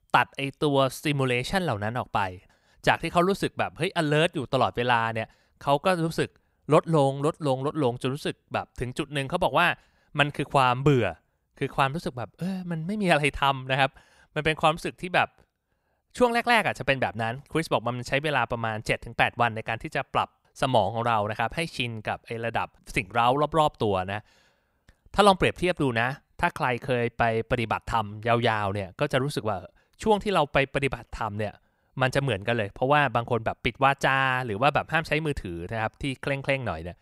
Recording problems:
none

